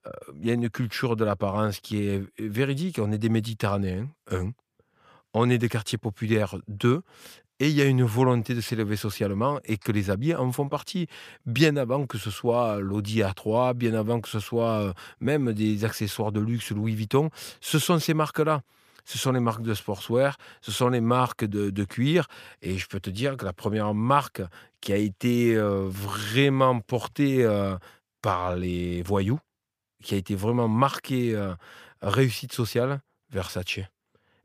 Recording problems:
none

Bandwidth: 15 kHz